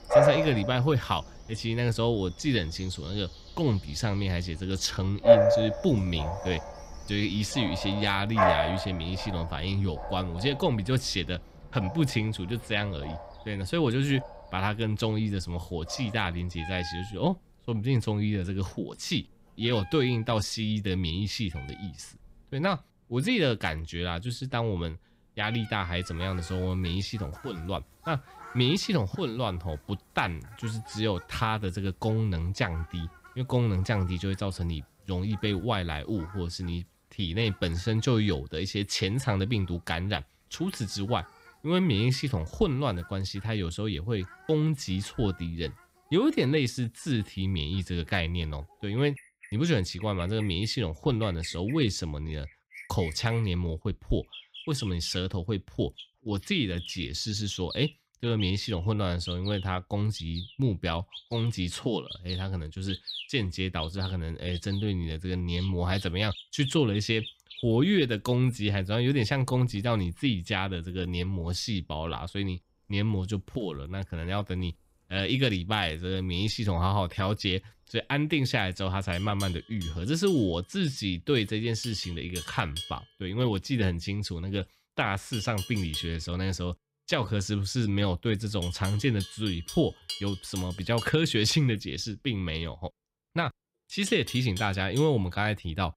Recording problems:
animal sounds; loud; throughout; 6 dB below the speech

